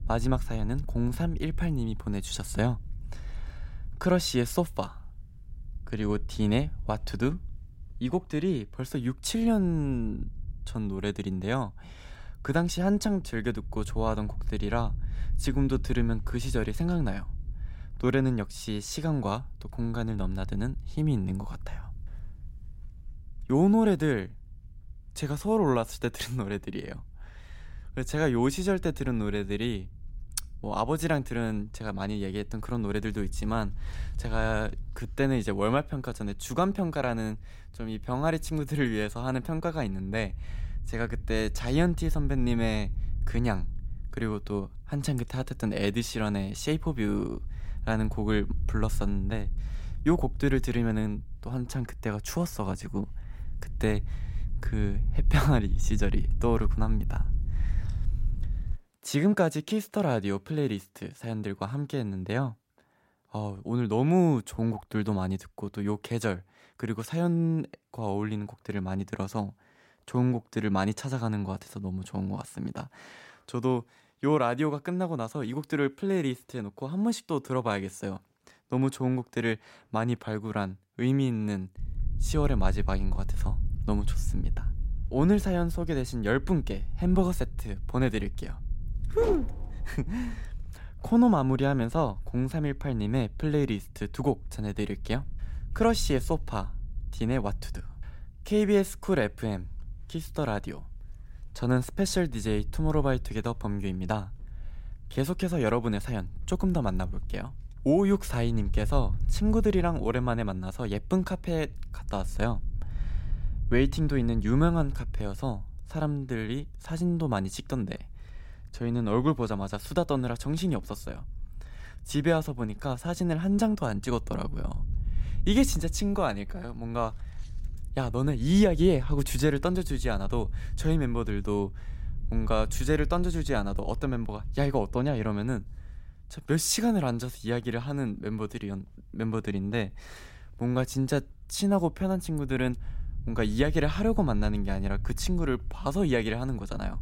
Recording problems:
wind noise on the microphone; occasional gusts; until 59 s and from 1:22 on; 25 dB below the speech

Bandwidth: 16 kHz